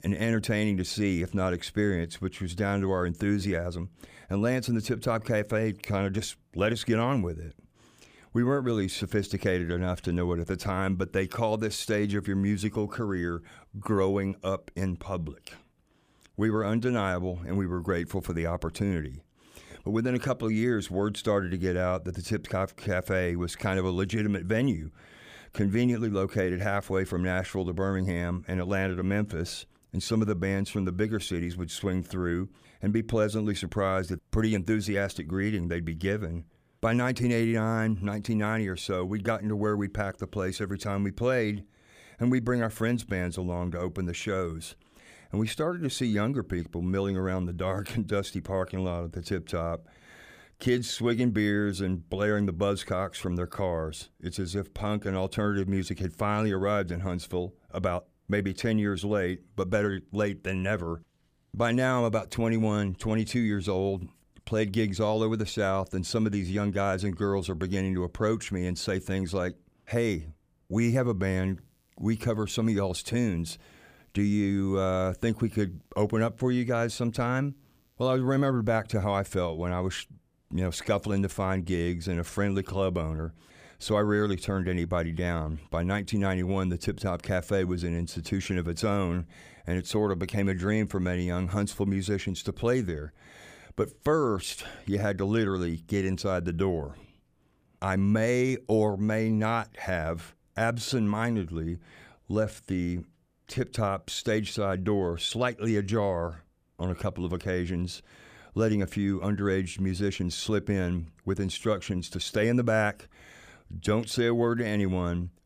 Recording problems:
none

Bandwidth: 15 kHz